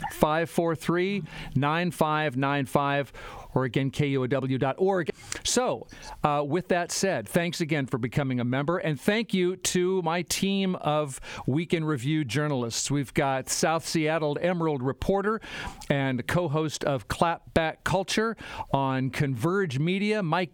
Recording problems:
squashed, flat; somewhat

